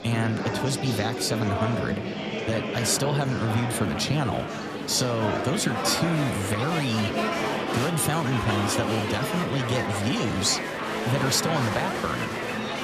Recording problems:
murmuring crowd; loud; throughout; 2 dB below the speech

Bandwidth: 14.5 kHz